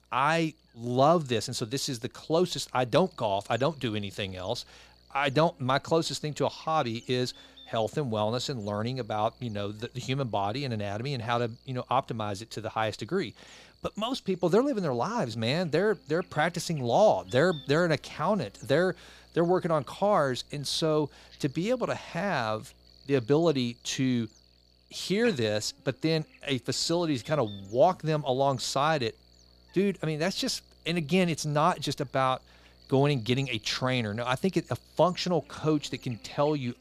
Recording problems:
electrical hum; faint; throughout; 60 Hz, 25 dB below the speech

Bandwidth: 15 kHz